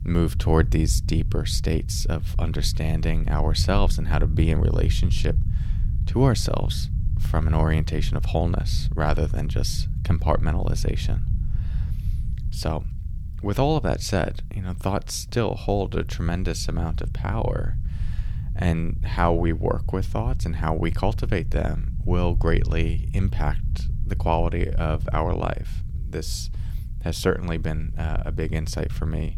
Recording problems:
low rumble; noticeable; throughout; 15 dB below the speech

